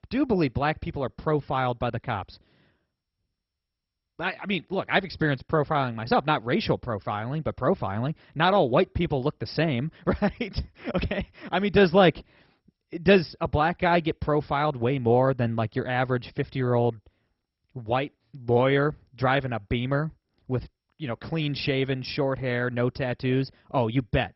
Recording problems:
garbled, watery; badly; nothing above 5.5 kHz

